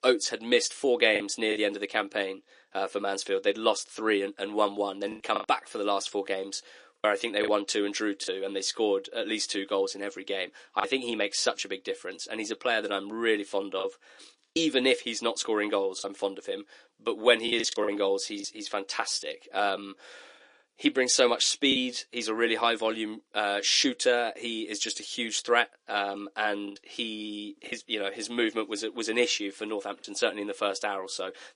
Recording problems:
thin; somewhat; fading below 300 Hz
garbled, watery; slightly; nothing above 10.5 kHz
choppy; occasionally; 3% of the speech affected

